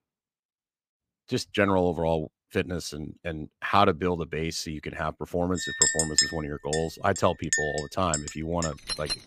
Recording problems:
household noises; very faint; from 5.5 s on; 1 dB above the speech

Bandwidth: 15 kHz